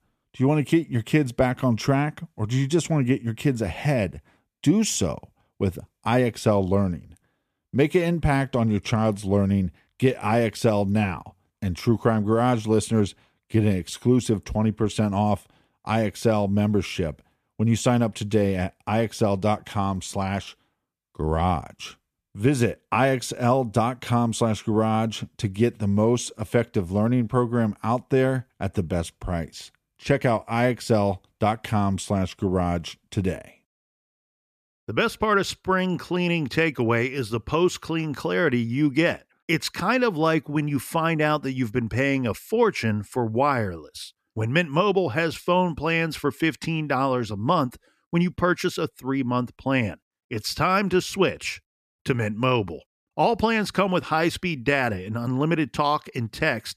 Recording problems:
none

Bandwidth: 14.5 kHz